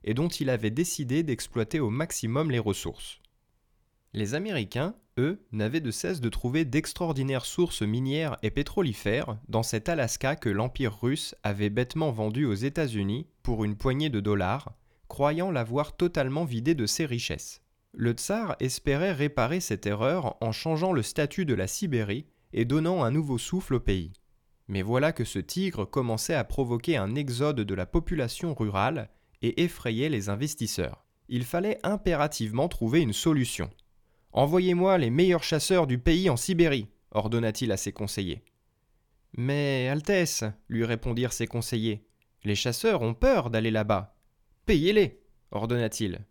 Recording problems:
none

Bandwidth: 18.5 kHz